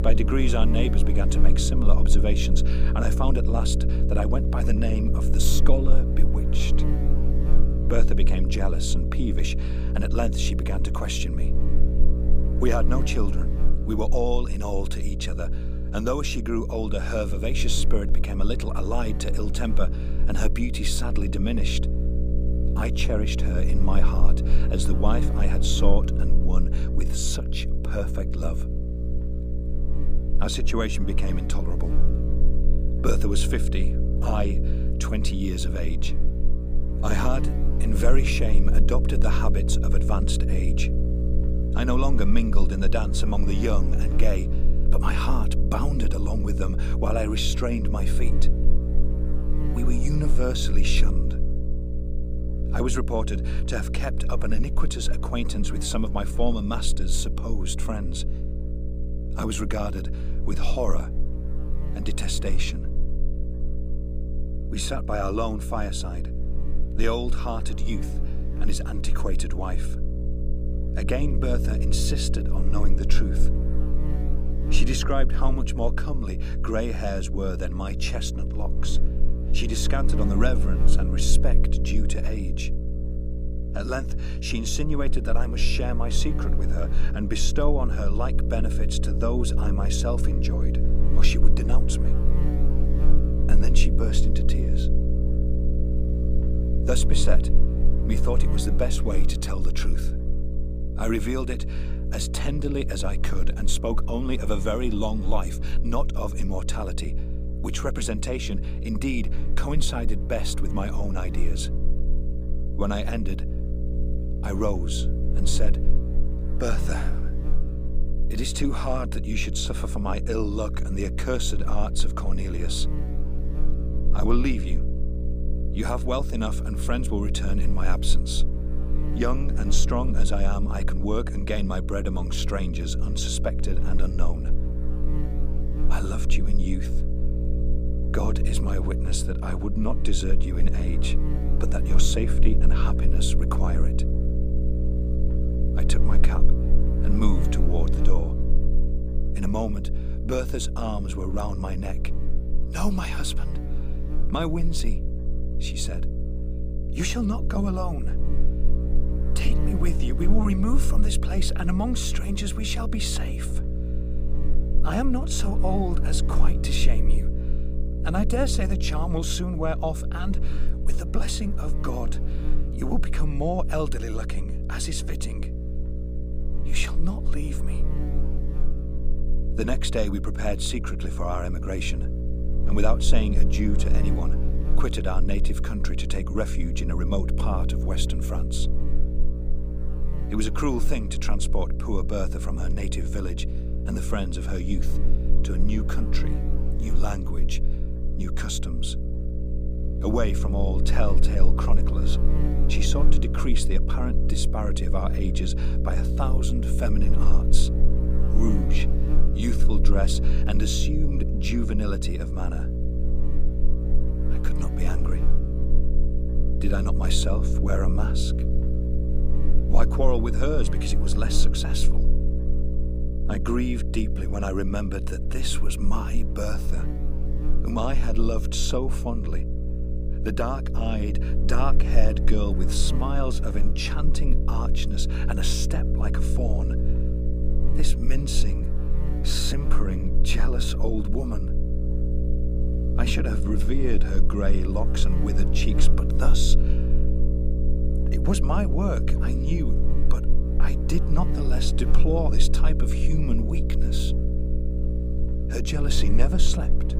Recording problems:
electrical hum; loud; throughout; 60 Hz, 7 dB below the speech

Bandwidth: 15 kHz